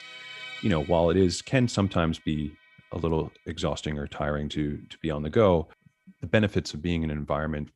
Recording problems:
background music; noticeable; throughout; 15 dB below the speech

